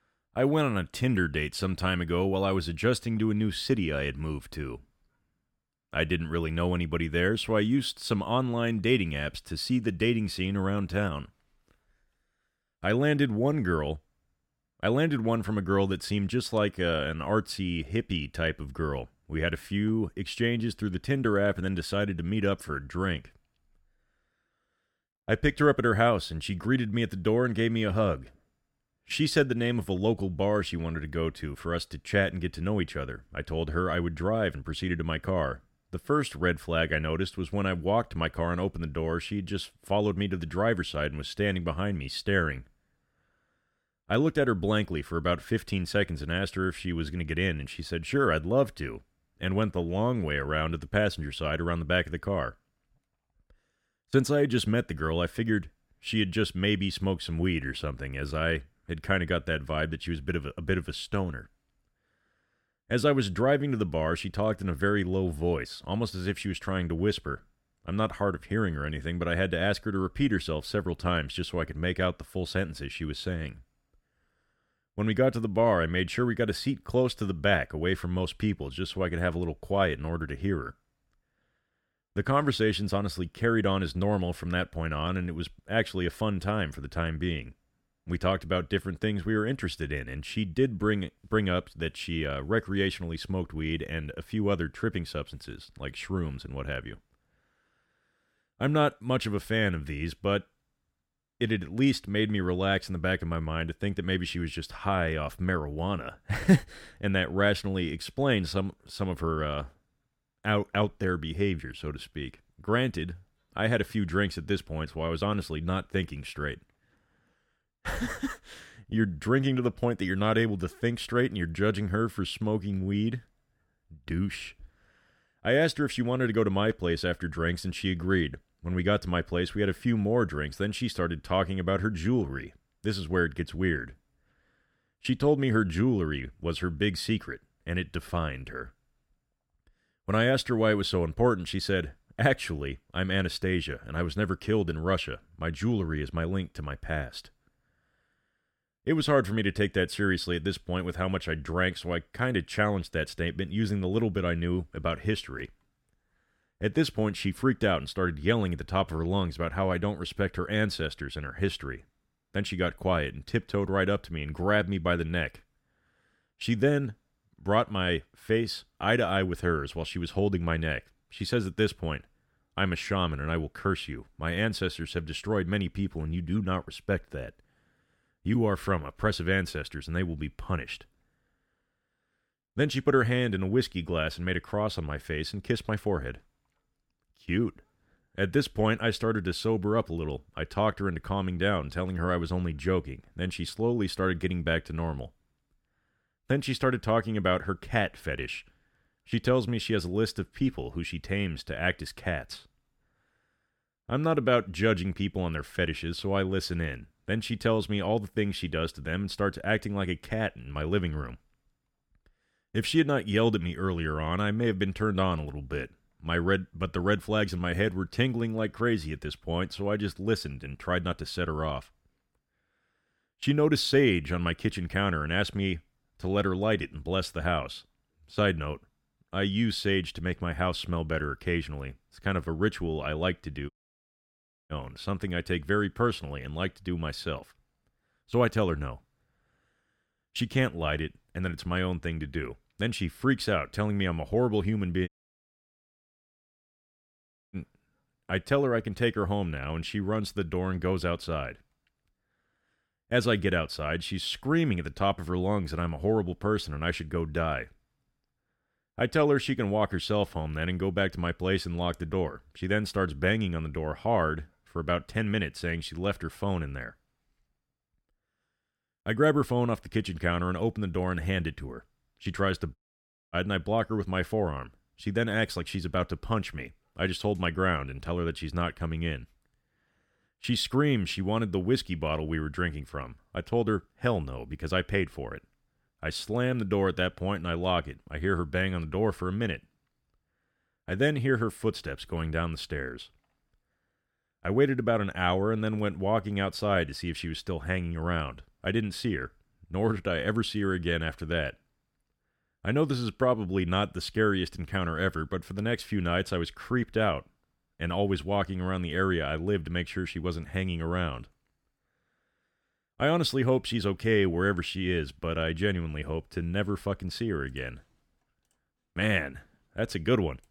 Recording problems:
audio cutting out; at 3:54 for 1 s, at 4:05 for 2.5 s and at 4:33 for 0.5 s

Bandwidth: 17 kHz